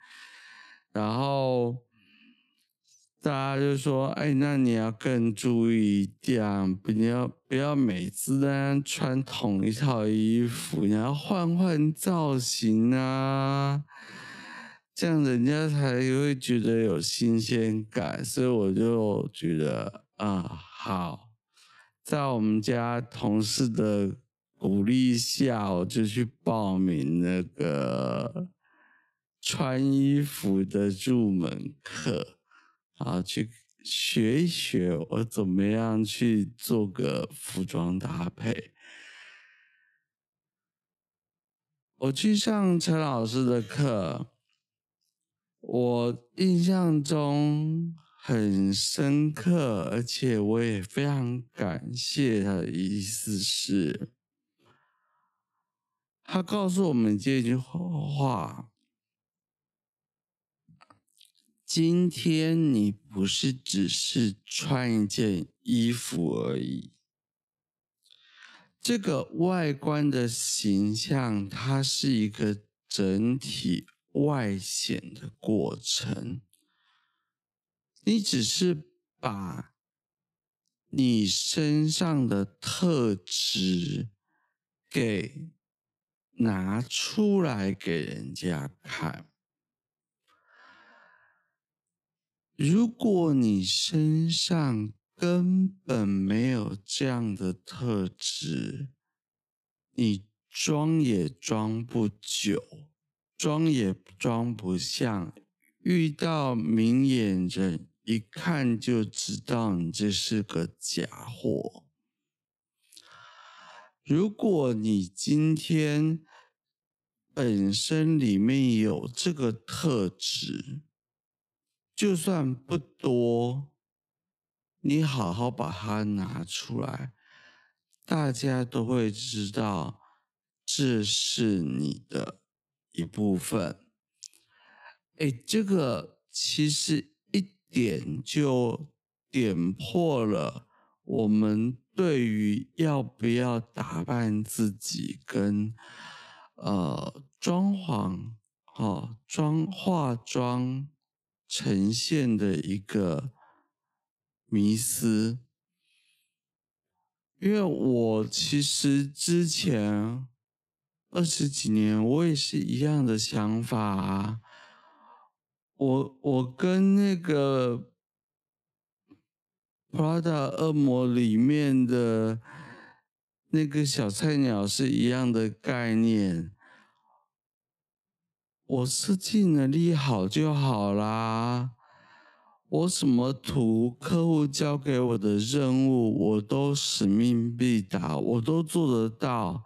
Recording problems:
wrong speed, natural pitch; too slow; 0.5 times normal speed

